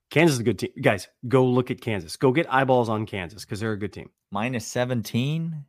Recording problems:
none

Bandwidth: 15 kHz